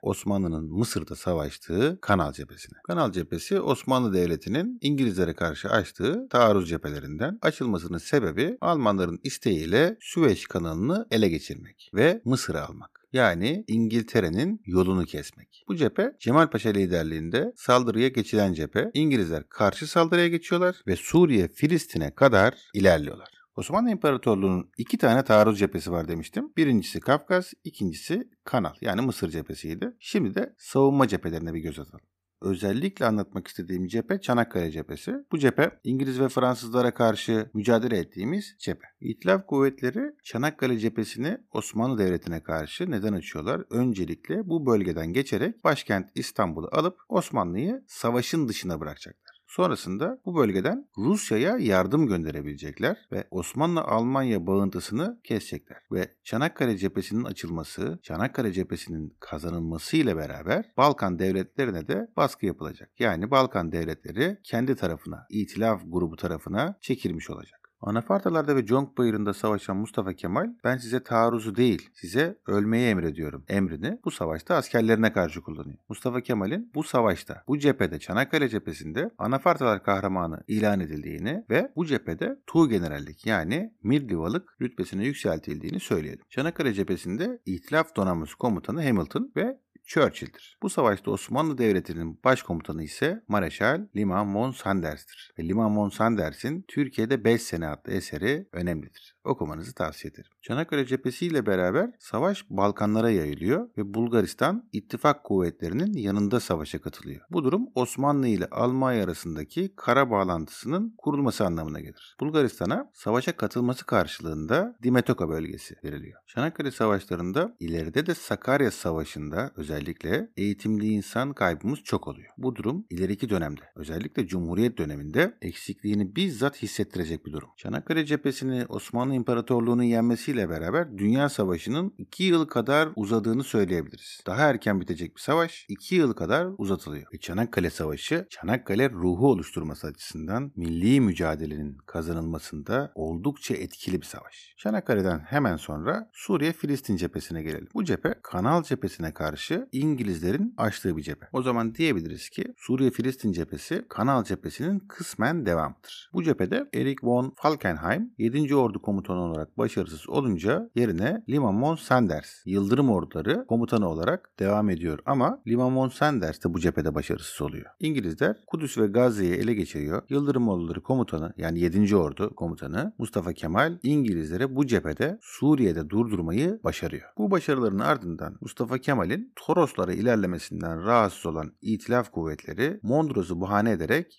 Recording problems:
none

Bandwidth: 14.5 kHz